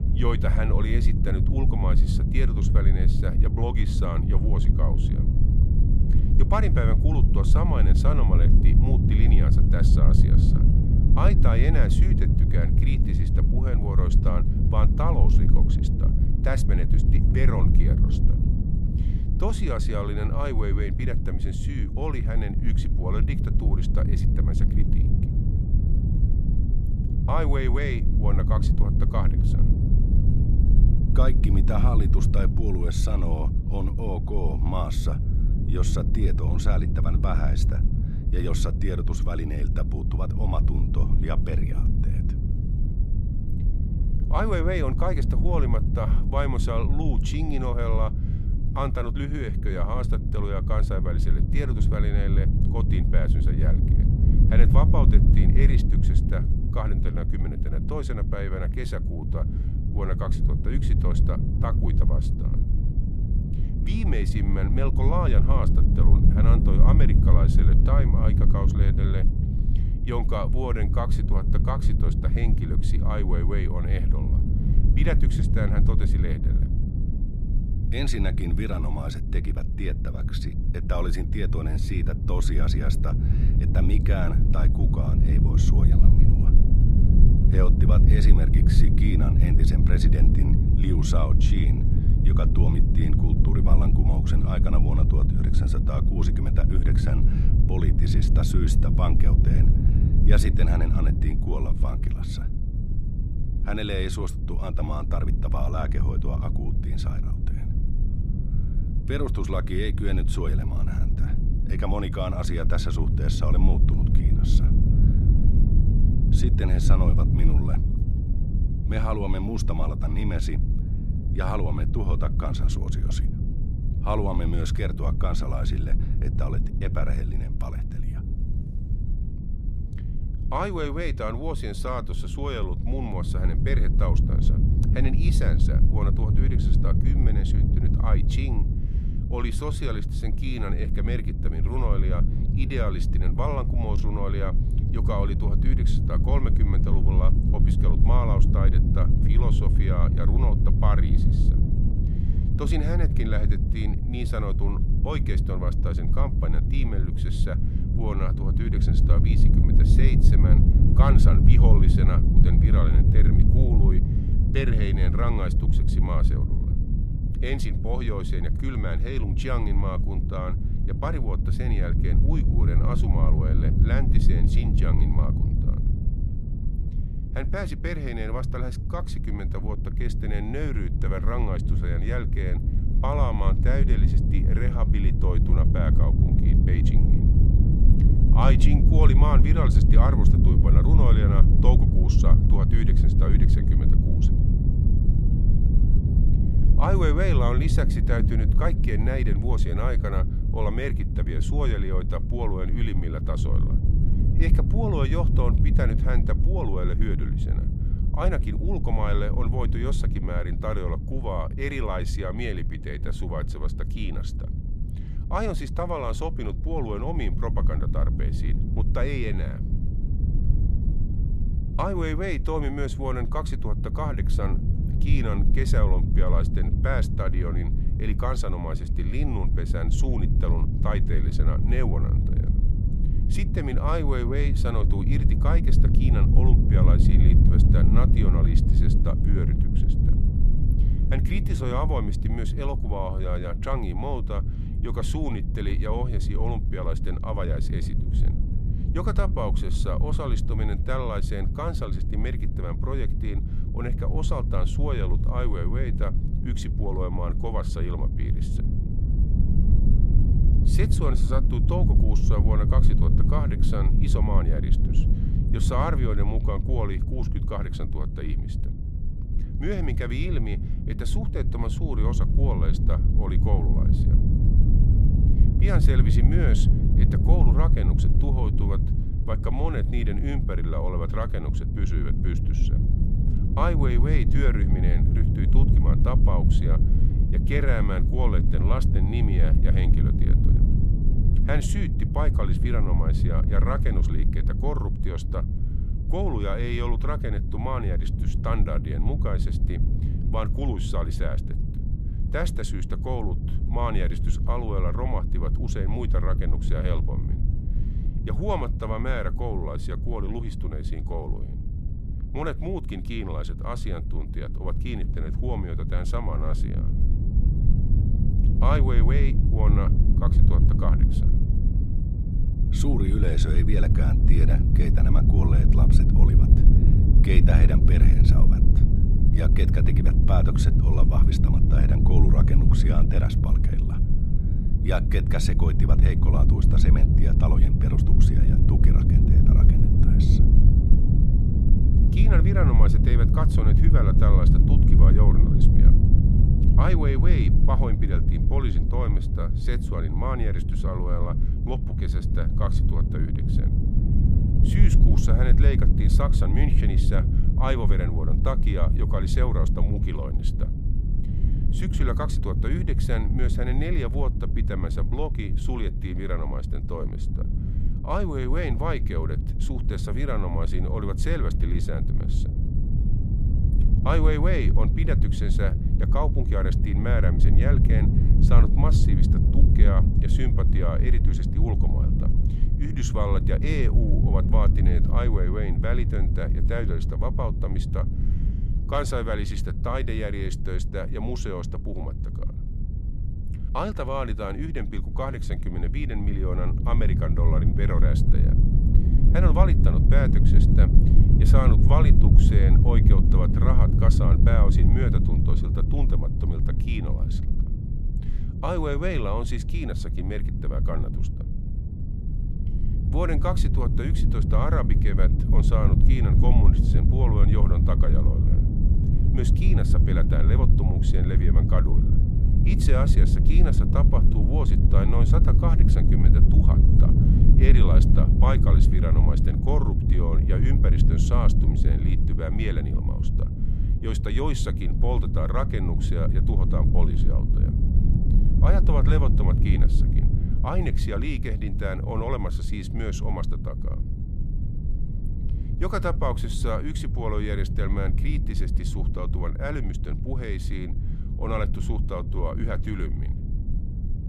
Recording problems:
low rumble; loud; throughout; 4 dB below the speech

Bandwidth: 15 kHz